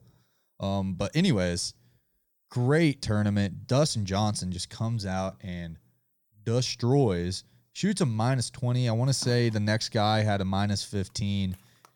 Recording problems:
none

